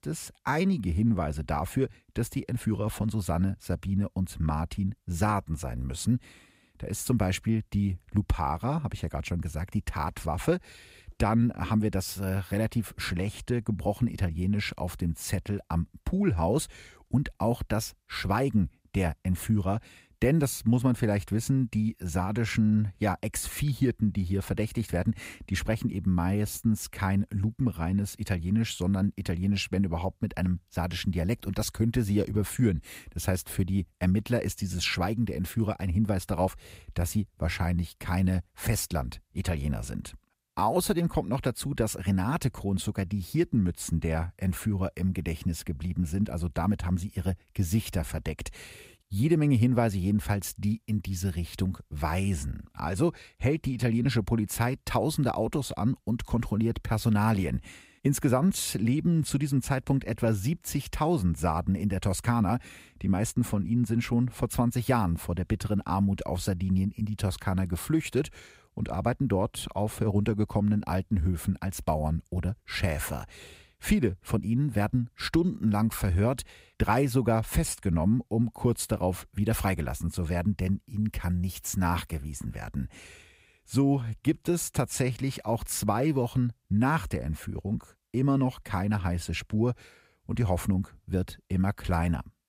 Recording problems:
none

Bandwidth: 15.5 kHz